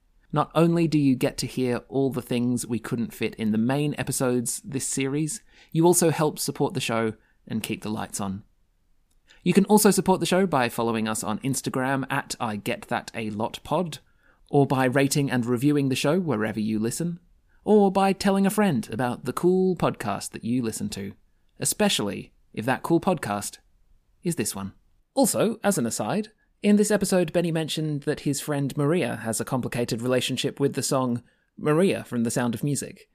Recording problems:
none

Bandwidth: 15 kHz